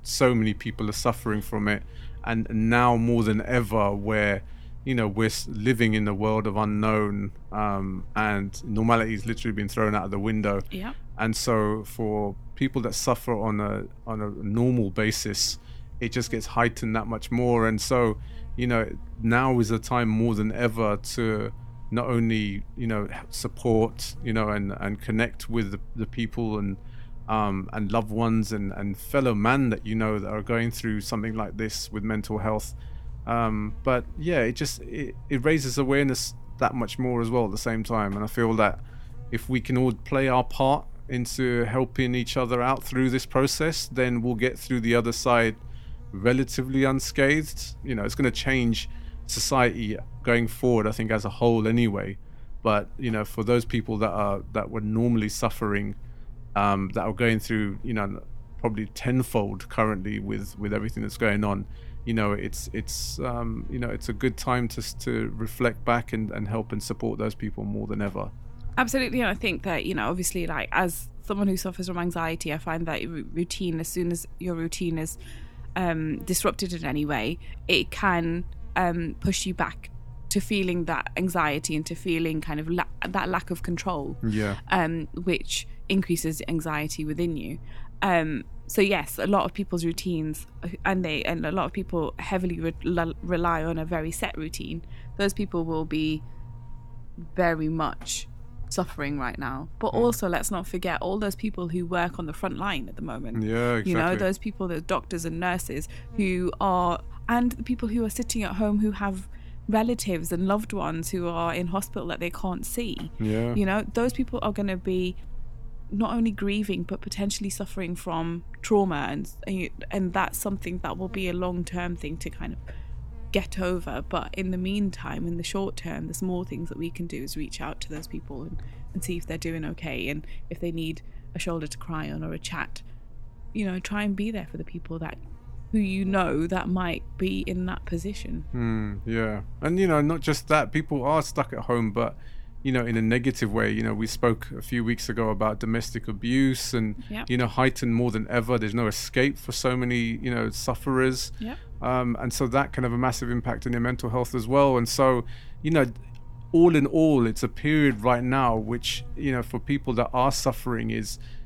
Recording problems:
electrical hum; faint; throughout; 50 Hz, 30 dB below the speech

